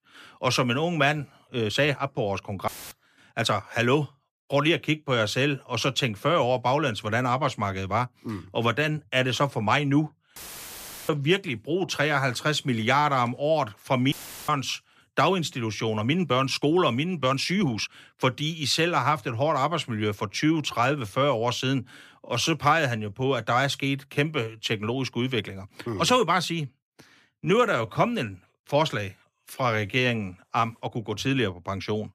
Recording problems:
uneven, jittery; strongly; from 1.5 to 31 s
audio cutting out; filled with static; at 2.5 s, at 10 s for 0.5 s and at 14 s

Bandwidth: 14.5 kHz